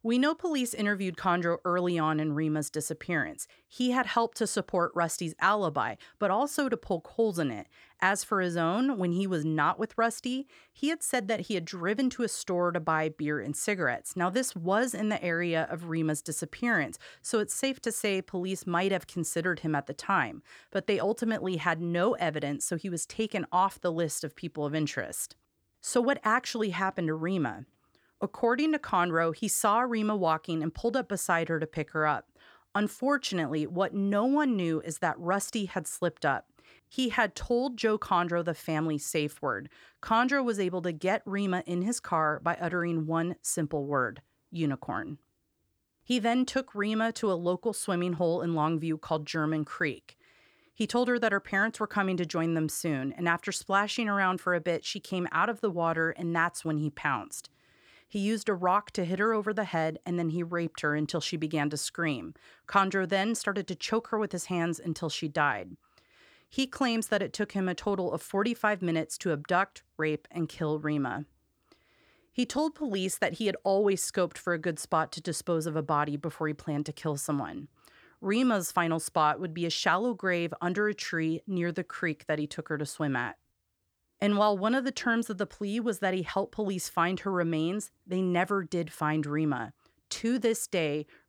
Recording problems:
none

